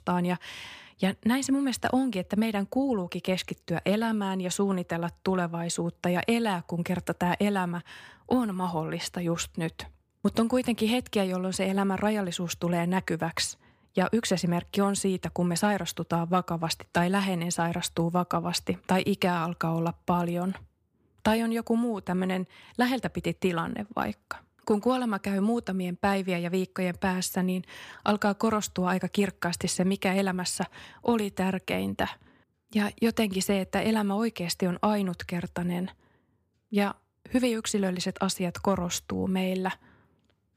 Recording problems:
none

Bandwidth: 15 kHz